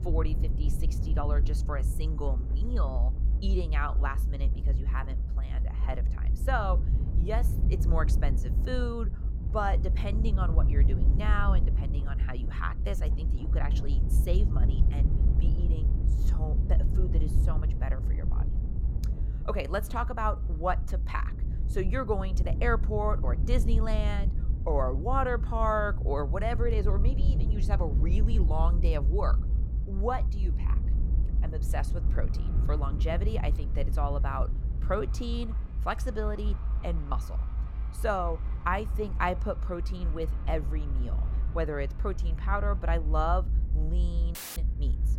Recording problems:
traffic noise; noticeable; throughout; 20 dB below the speech
low rumble; noticeable; throughout; 15 dB below the speech
audio cutting out; filled with static; at 44 s

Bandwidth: 16.5 kHz